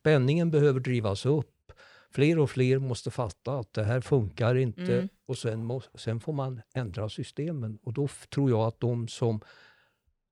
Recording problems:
none

